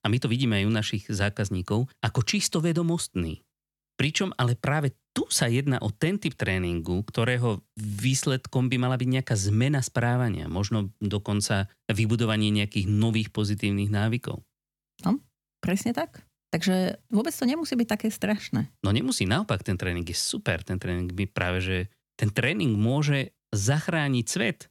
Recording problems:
none

